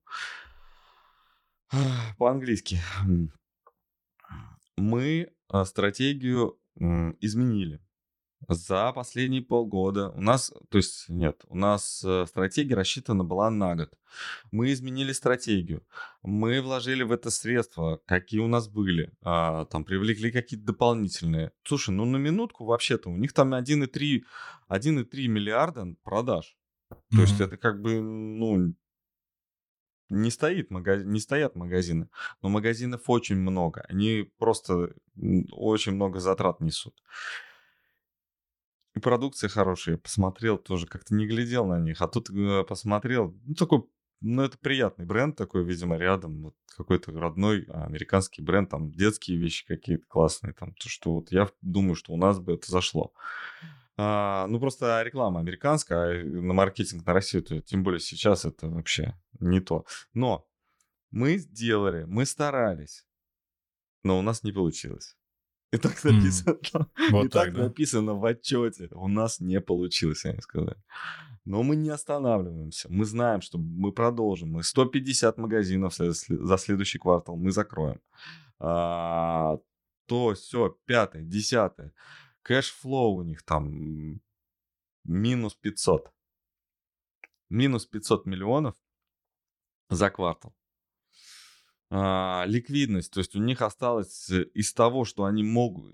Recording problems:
none

